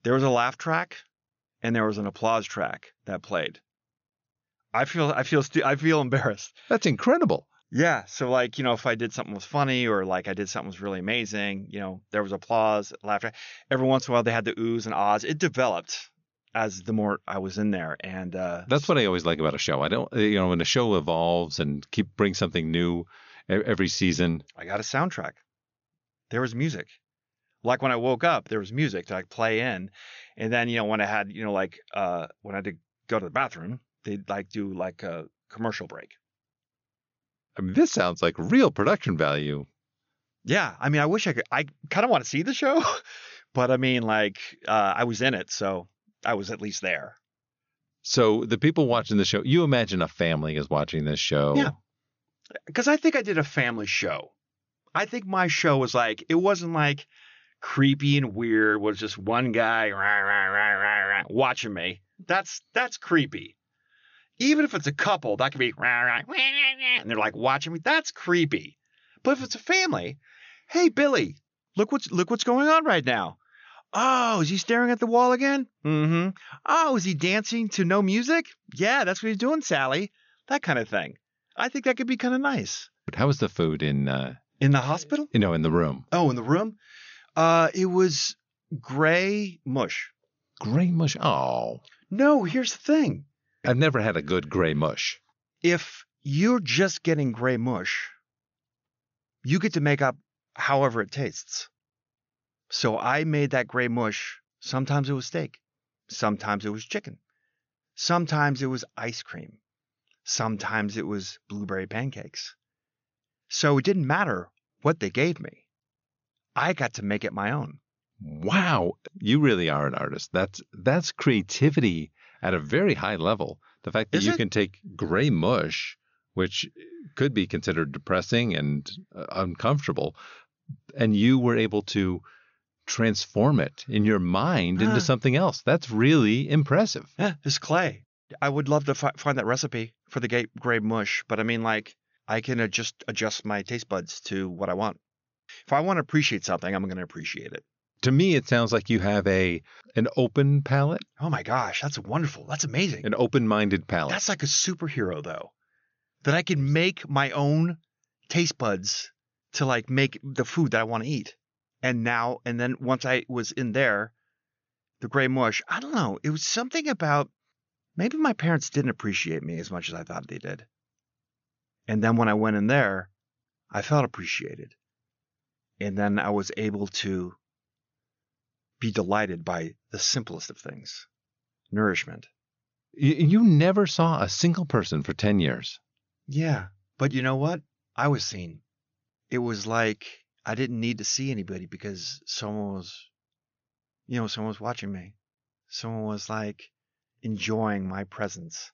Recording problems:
high frequencies cut off; noticeable; nothing above 6.5 kHz

